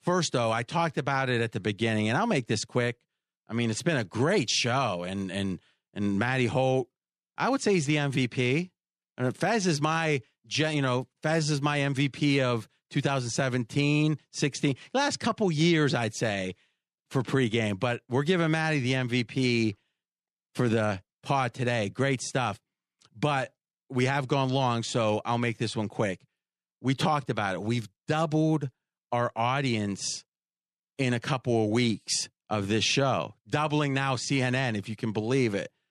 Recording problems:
none

